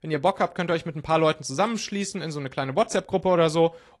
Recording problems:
garbled, watery; slightly

